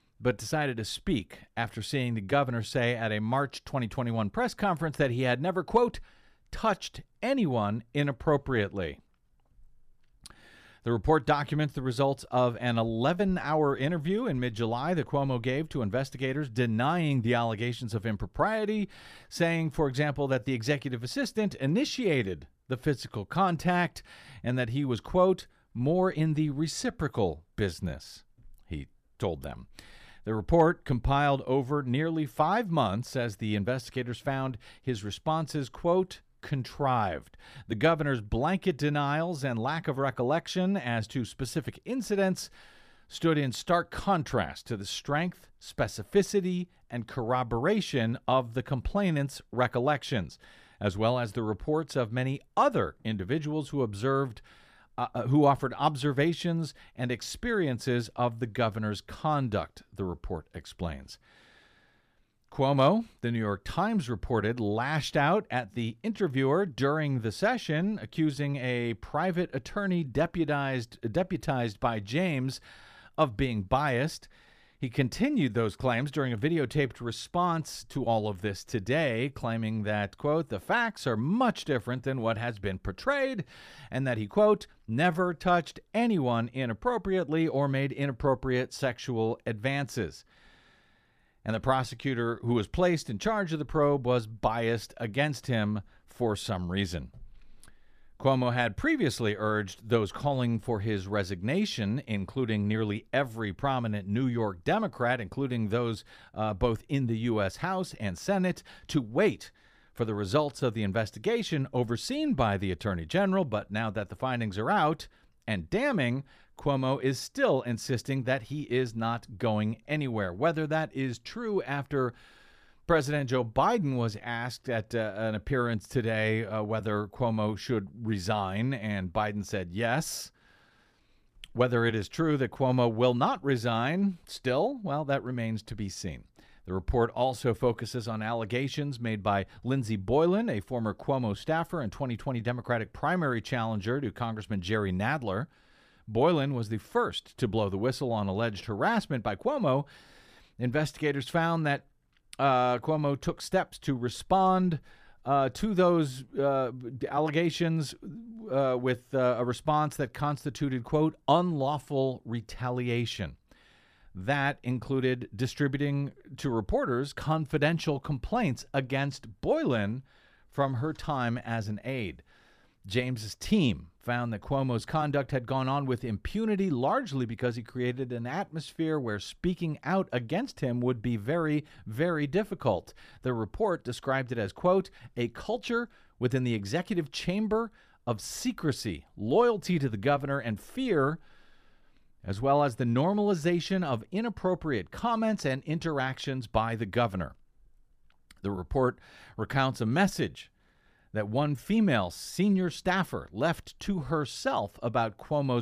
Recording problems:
abrupt cut into speech; at the end

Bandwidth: 14.5 kHz